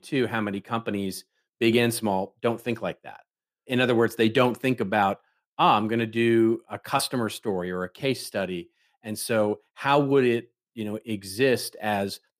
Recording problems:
none

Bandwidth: 15 kHz